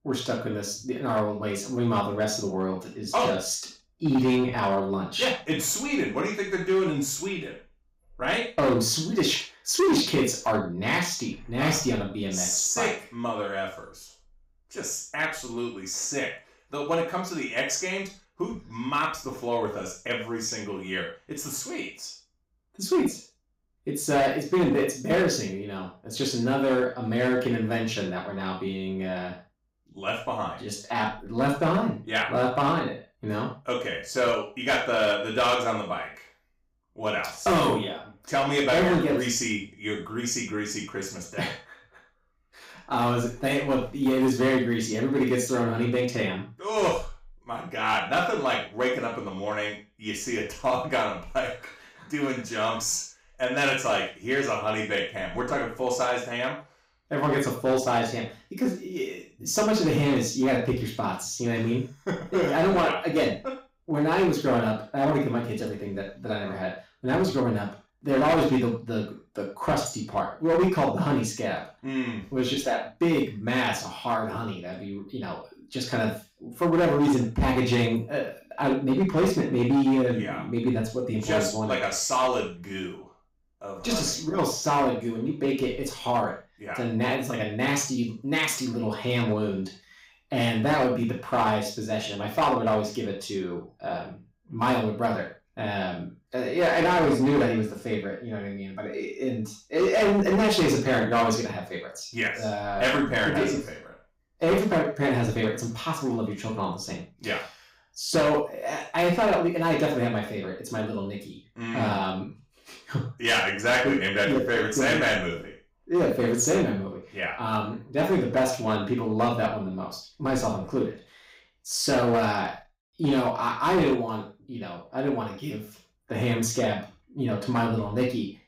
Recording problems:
off-mic speech; far
room echo; noticeable; dies away in 0.3 s
distortion; slight; 5% of the sound clipped

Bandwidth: 15.5 kHz